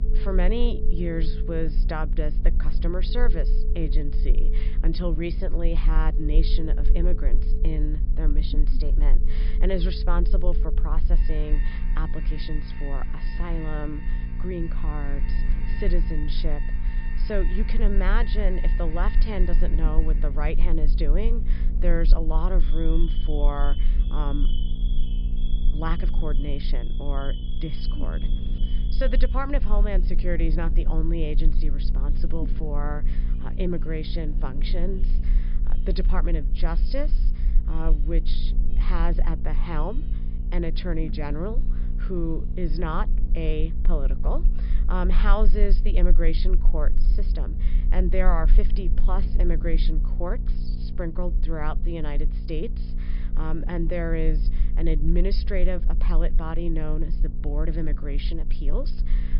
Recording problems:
high frequencies cut off; noticeable; nothing above 5.5 kHz
electrical hum; noticeable; throughout; 60 Hz, 15 dB below the speech
alarms or sirens; noticeable; until 43 s; 15 dB below the speech
low rumble; noticeable; throughout; 20 dB below the speech

